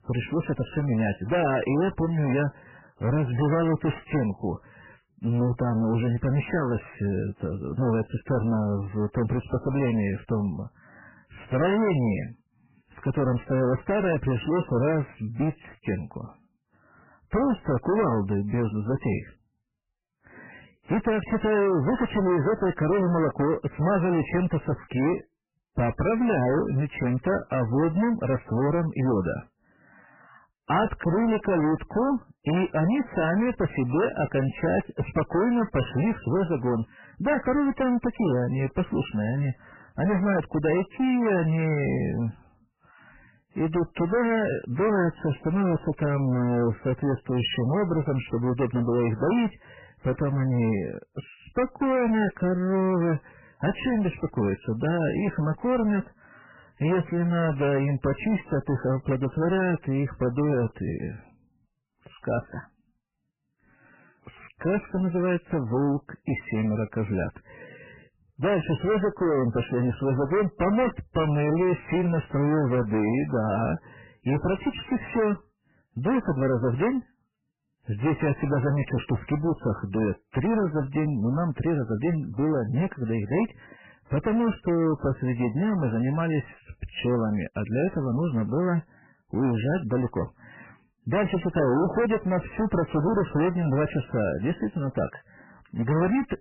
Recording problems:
distortion; heavy; 19% of the sound clipped
garbled, watery; badly; nothing above 3 kHz

